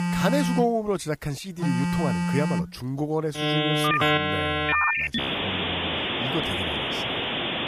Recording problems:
alarms or sirens; very loud; throughout; 5 dB above the speech

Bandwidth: 15 kHz